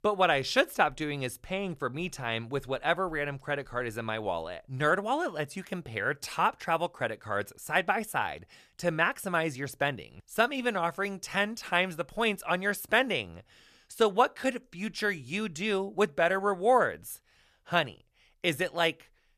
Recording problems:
none

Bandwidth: 14.5 kHz